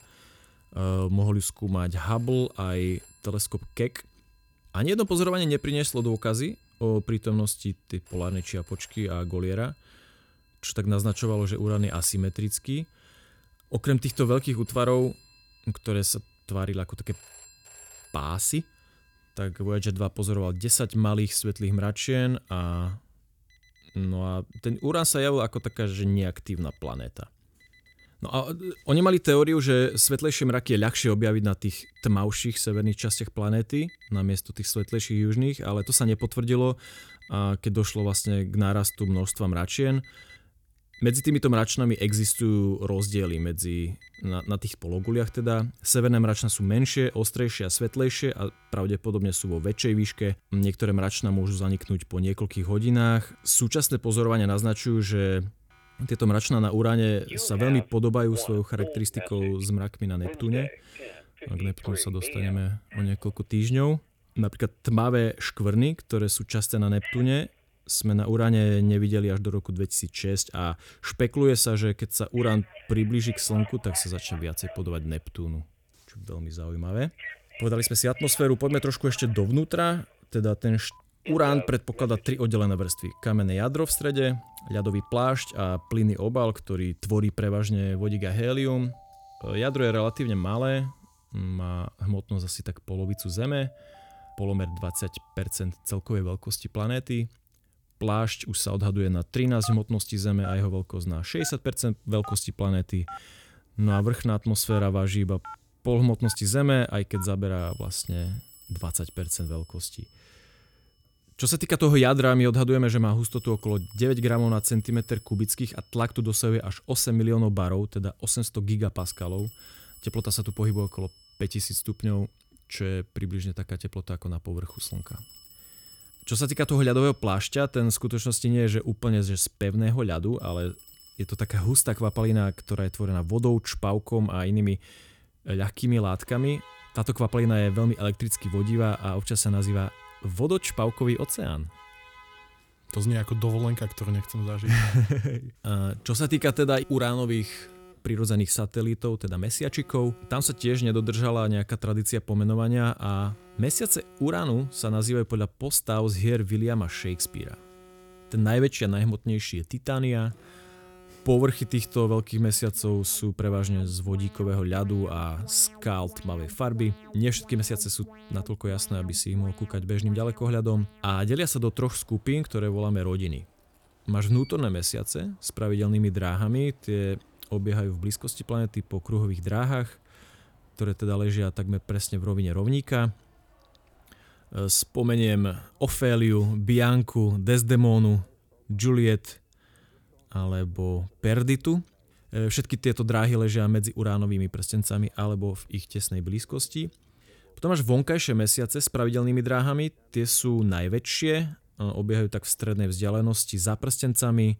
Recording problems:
alarms or sirens; faint; throughout; 20 dB below the speech

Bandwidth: 19 kHz